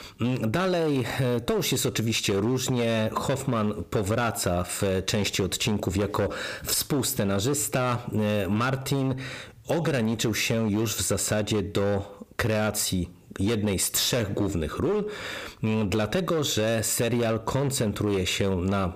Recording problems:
distortion; slight; 14% of the sound clipped
squashed, flat; somewhat

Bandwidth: 15 kHz